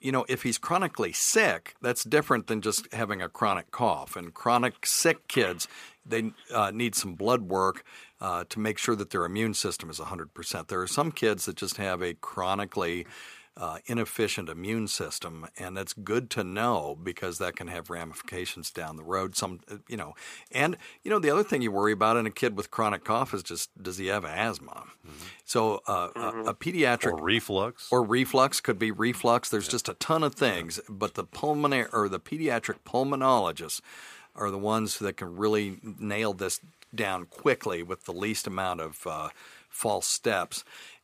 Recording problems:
thin; very slightly; fading below 350 Hz

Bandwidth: 15 kHz